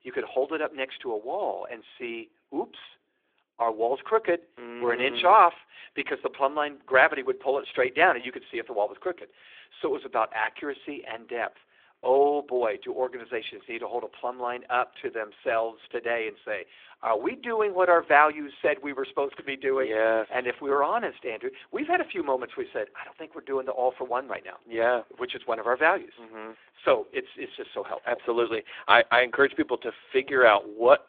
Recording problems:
phone-call audio; nothing above 3.5 kHz

